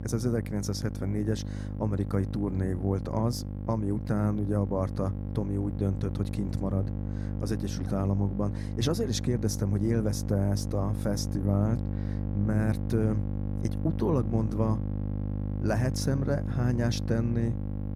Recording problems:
electrical hum; loud; throughout; 50 Hz, 8 dB below the speech

